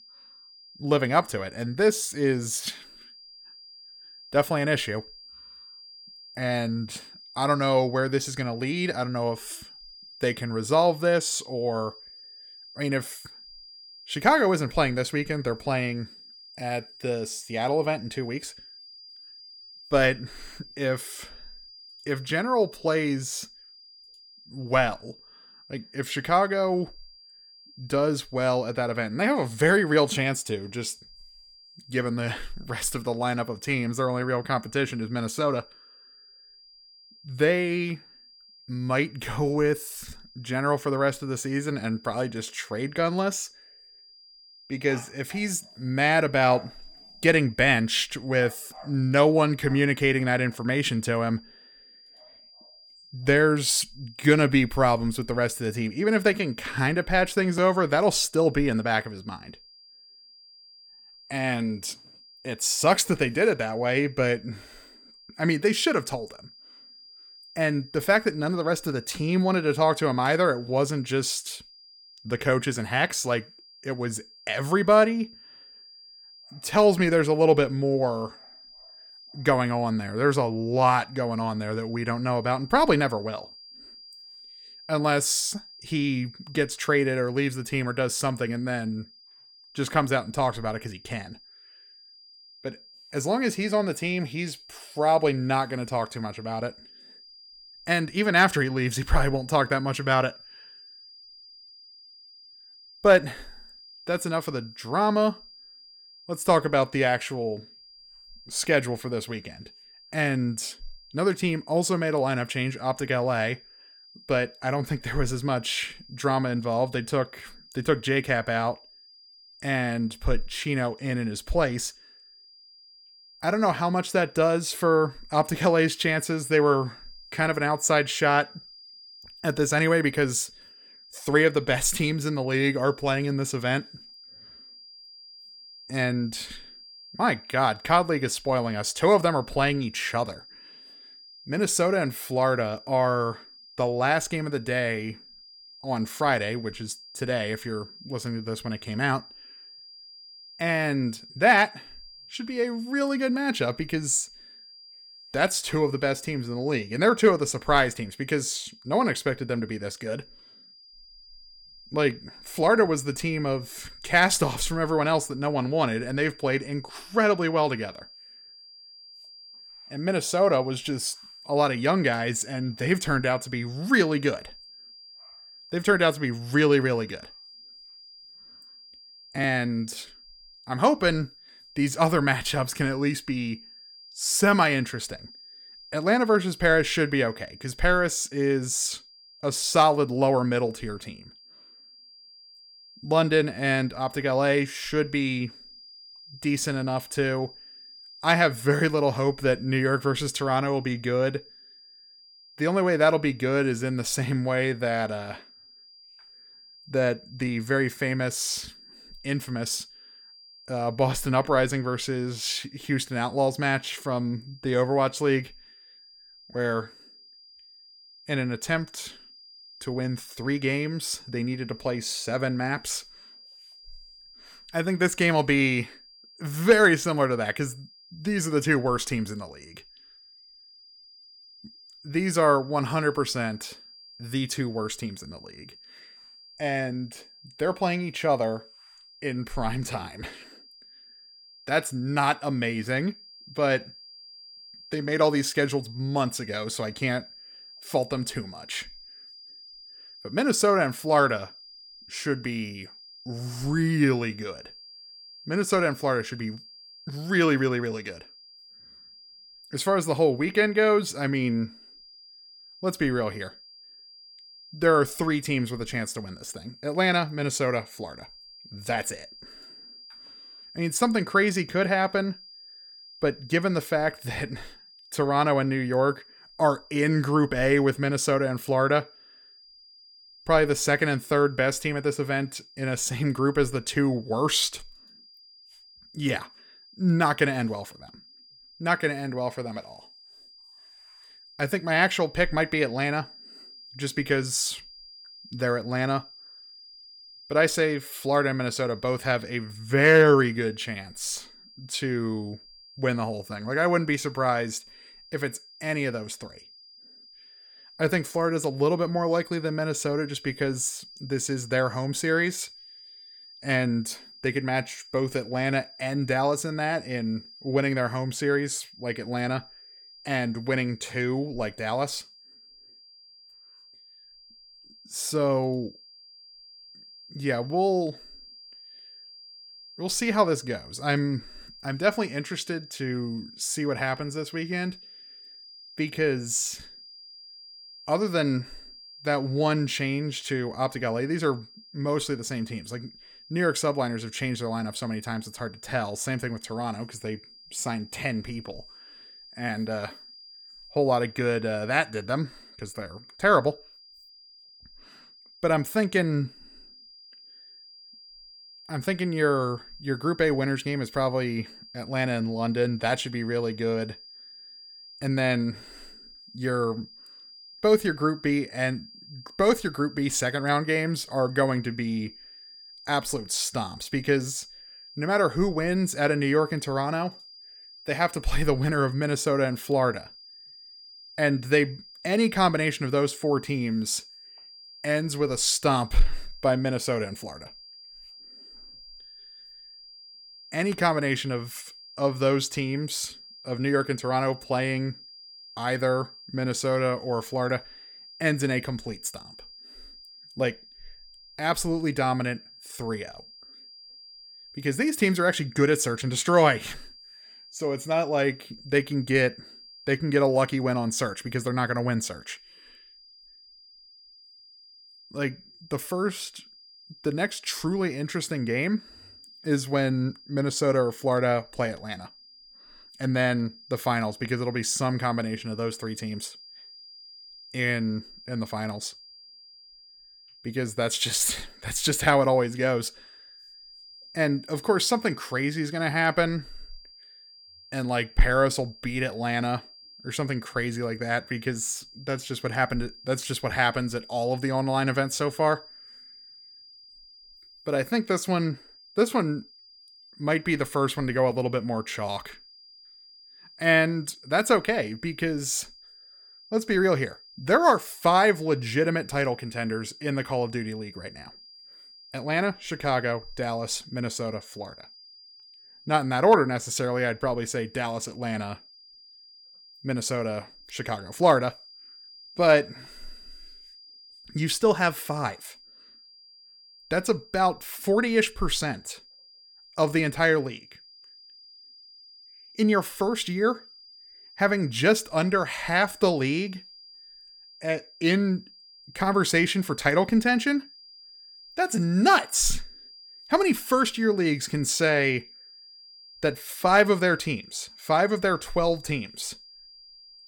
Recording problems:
high-pitched whine; faint; throughout; 5 kHz, 20 dB below the speech

